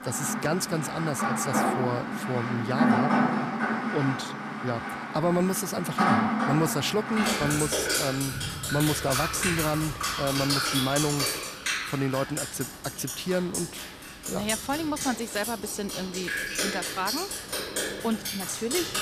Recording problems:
rain or running water; very loud; throughout; 1 dB above the speech

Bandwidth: 14.5 kHz